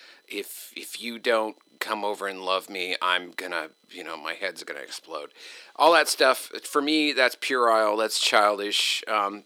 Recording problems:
thin; somewhat; fading below 300 Hz

